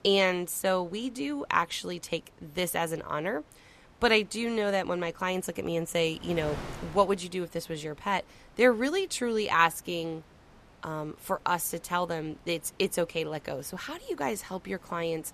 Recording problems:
wind noise on the microphone; occasional gusts; 25 dB below the speech

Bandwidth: 14 kHz